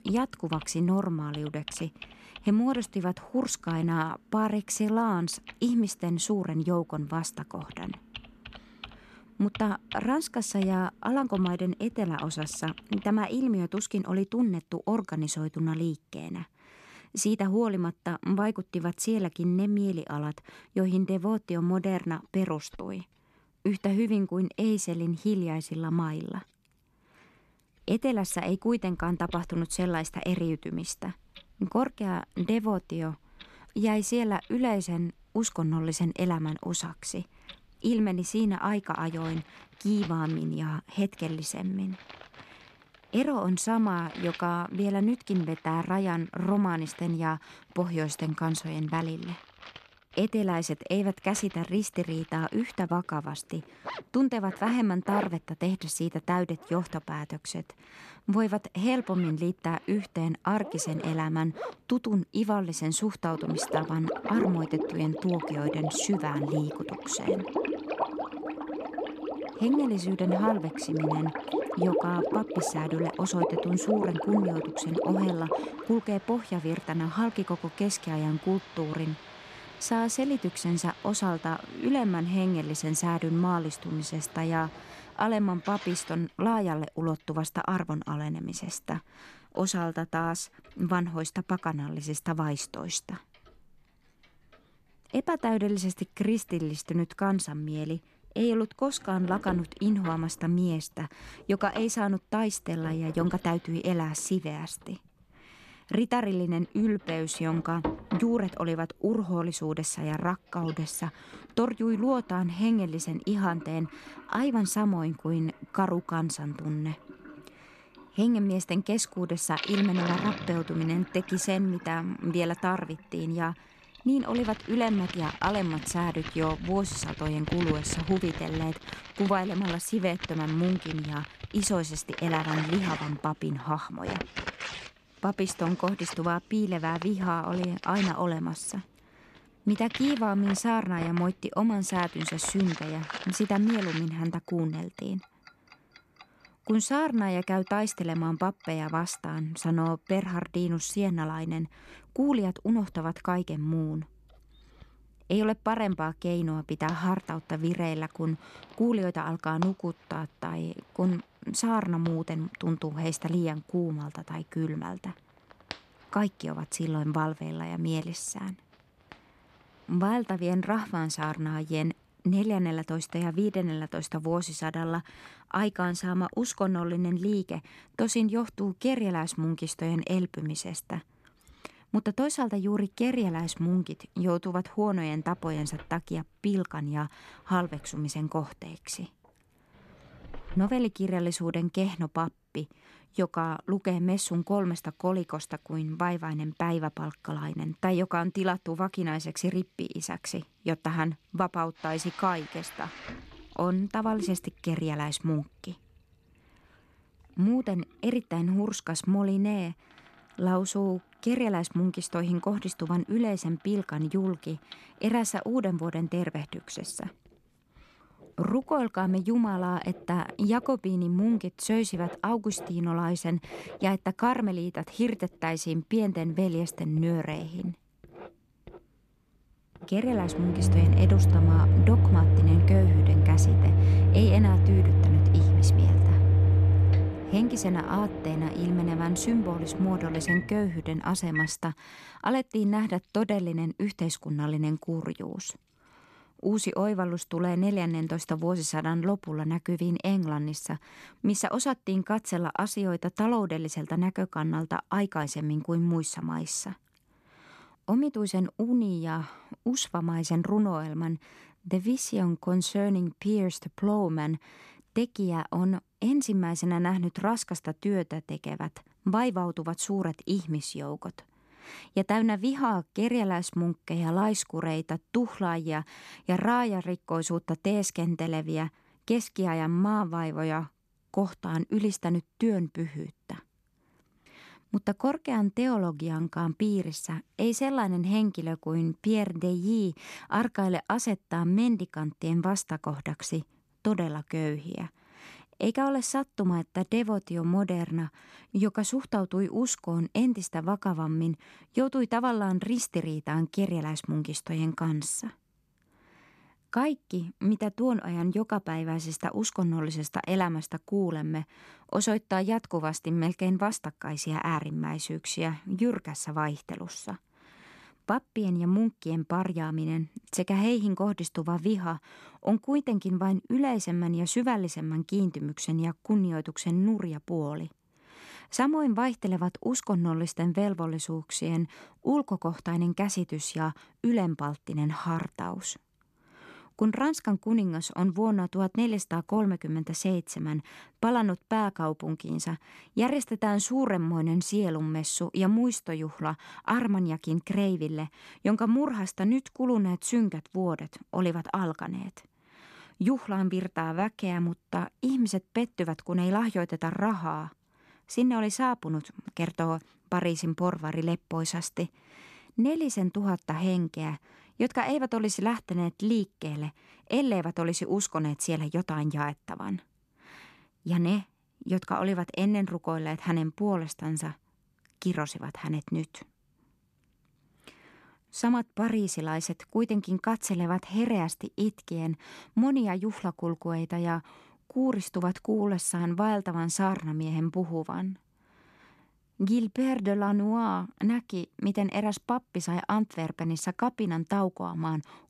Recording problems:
household noises; very loud; until 4:11; as loud as the speech

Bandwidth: 13.5 kHz